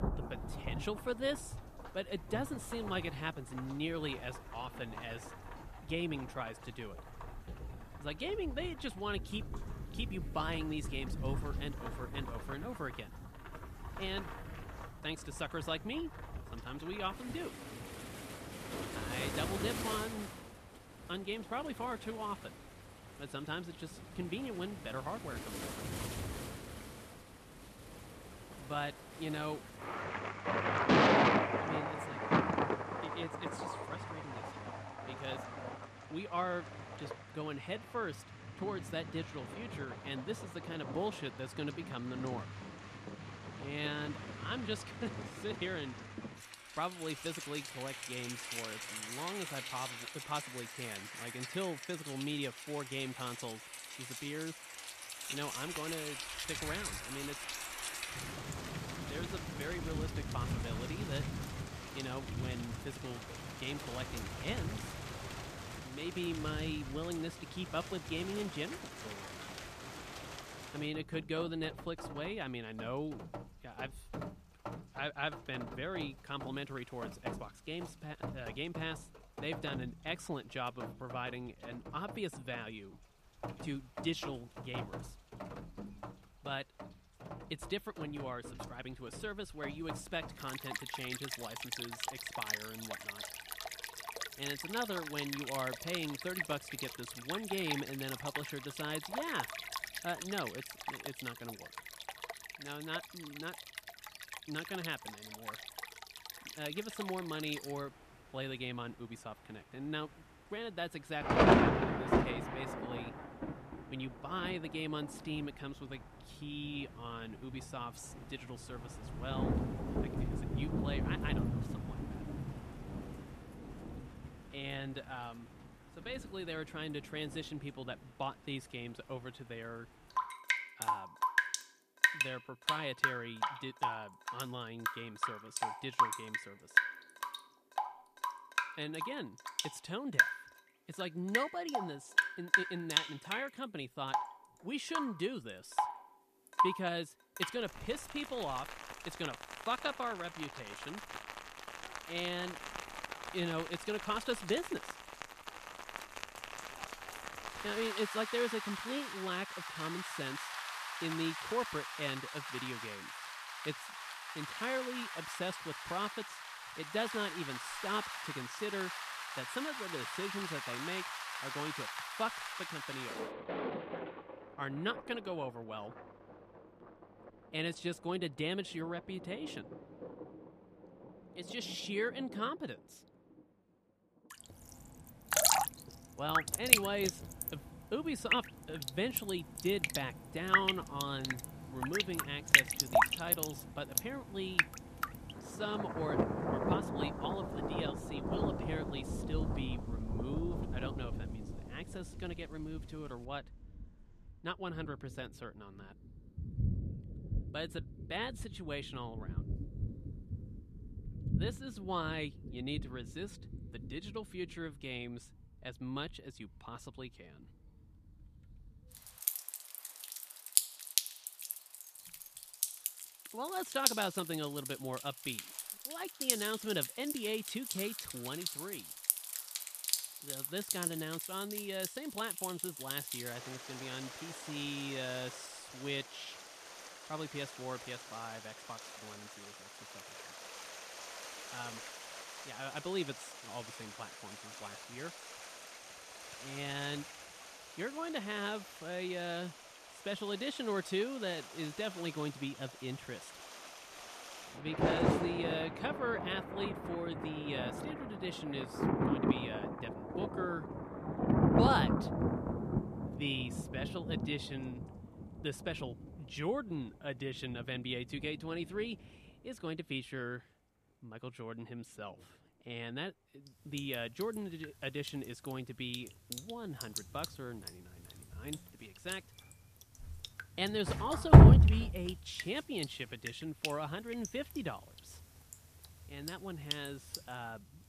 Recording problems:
rain or running water; very loud; throughout; 4 dB above the speech

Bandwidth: 14.5 kHz